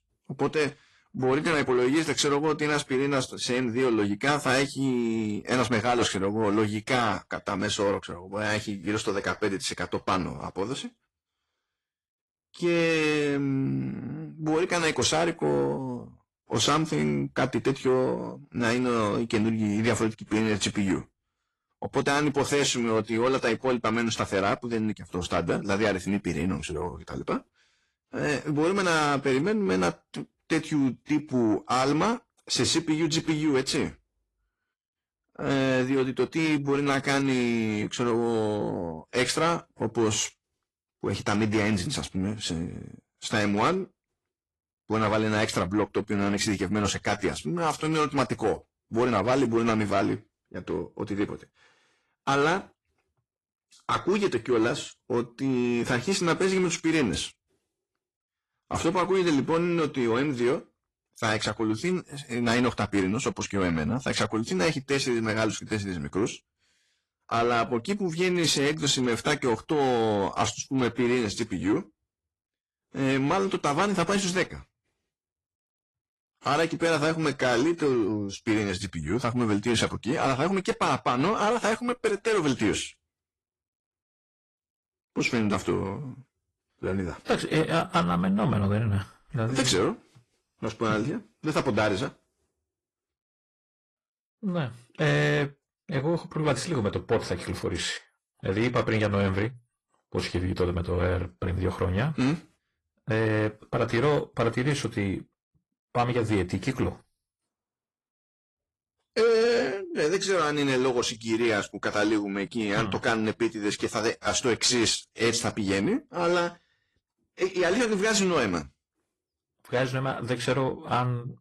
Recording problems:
distortion; slight; 10 dB below the speech
garbled, watery; slightly

